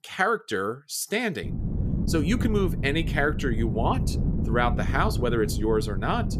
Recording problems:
wind noise on the microphone; occasional gusts; from 1.5 s on; 10 dB below the speech

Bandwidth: 14.5 kHz